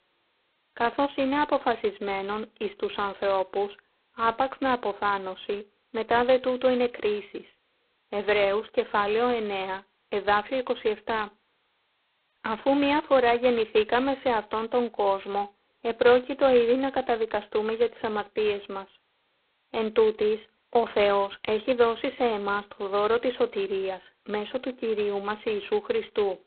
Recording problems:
phone-call audio; poor line; nothing above 4 kHz

